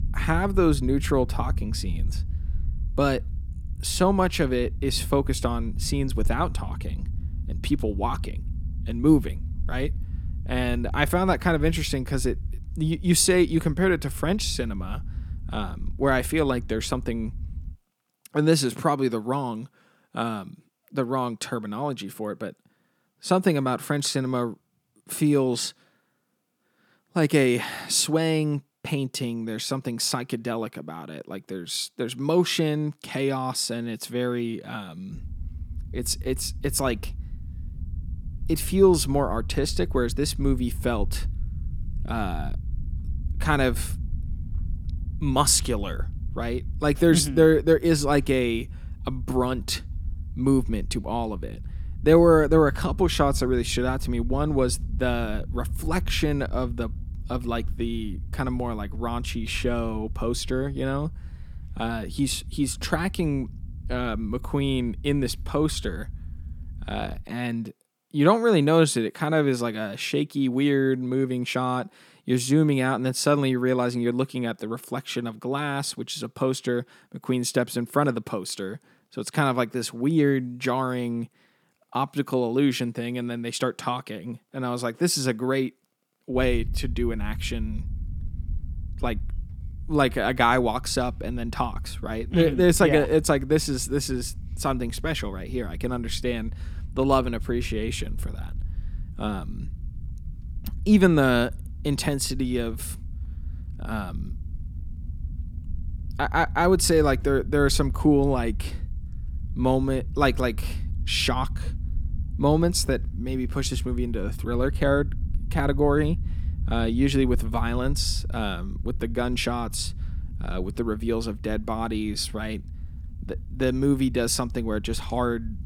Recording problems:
low rumble; faint; until 18 s, from 35 s to 1:07 and from 1:26 on; 25 dB below the speech

